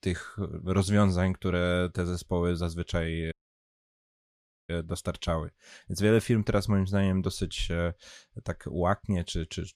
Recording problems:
audio cutting out; at 3.5 s for 1.5 s

